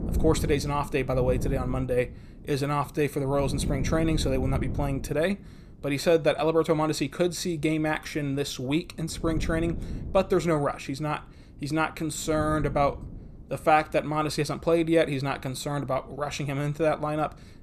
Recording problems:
wind noise on the microphone; occasional gusts; 15 dB below the speech

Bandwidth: 14.5 kHz